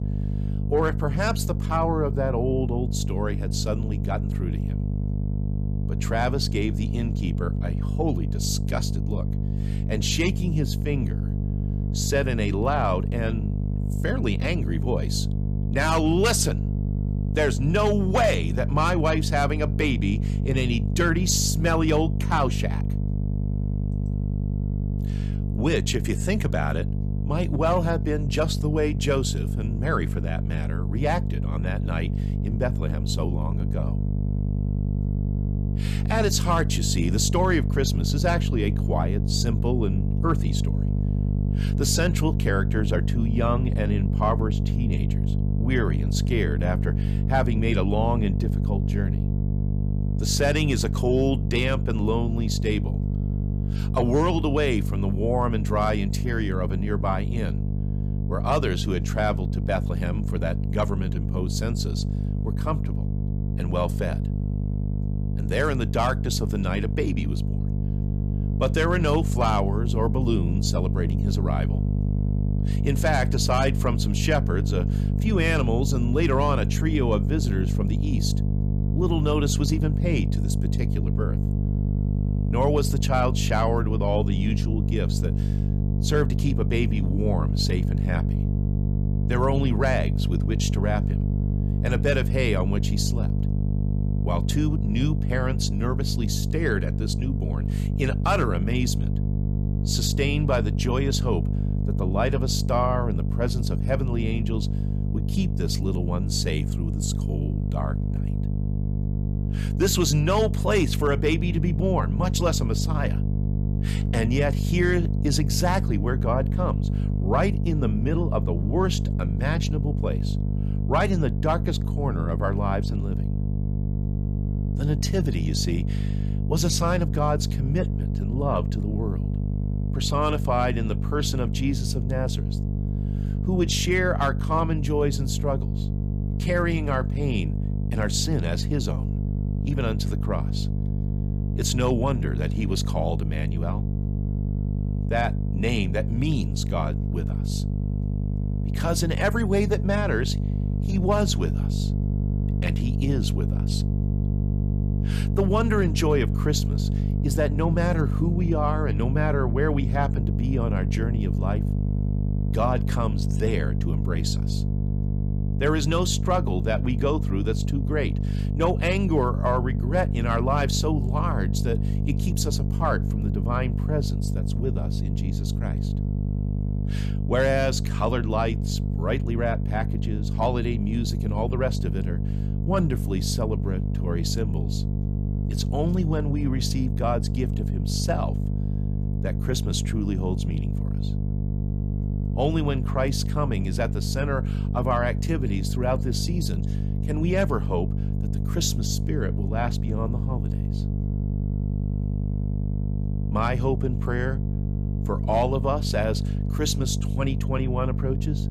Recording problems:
electrical hum; loud; throughout; 50 Hz, 9 dB below the speech

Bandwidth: 14.5 kHz